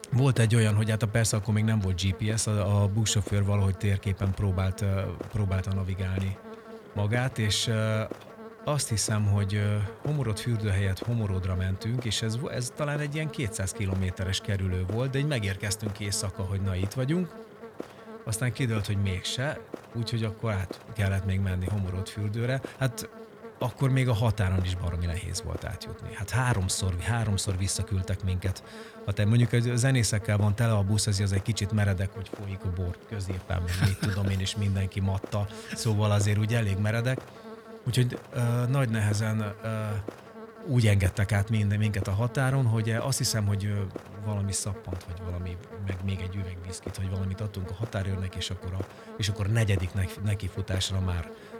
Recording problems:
electrical hum; noticeable; throughout; 50 Hz, 10 dB below the speech

